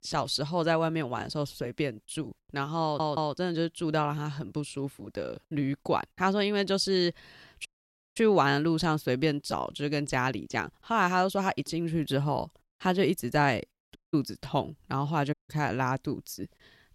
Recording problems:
audio stuttering; at 3 s
audio cutting out; at 7.5 s for 0.5 s, at 14 s and at 15 s

